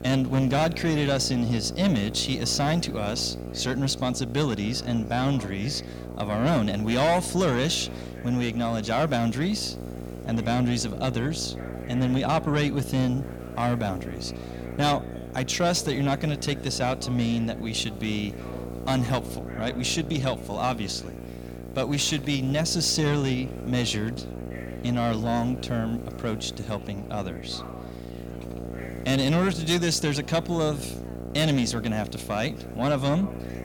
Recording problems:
distortion; slight; 10 dB below the speech
electrical hum; noticeable; throughout; 60 Hz, 15 dB below the speech
background chatter; faint; throughout; 4 voices, 20 dB below the speech
hiss; faint; throughout; 30 dB below the speech

